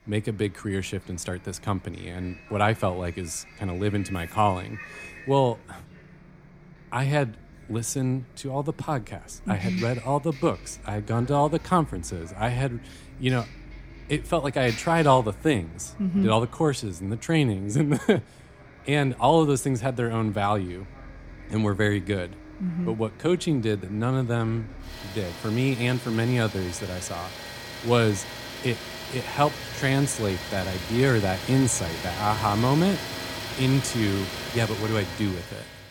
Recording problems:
traffic noise; noticeable; throughout; 10 dB below the speech

